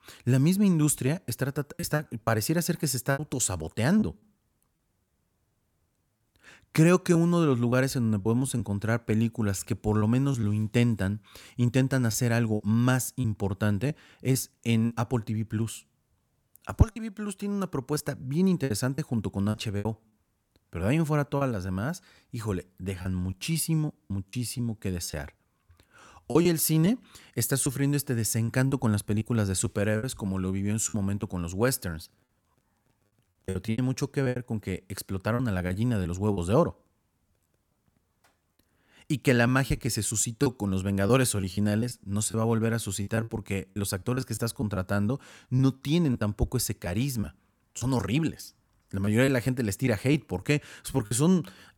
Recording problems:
choppy; very; 7% of the speech affected

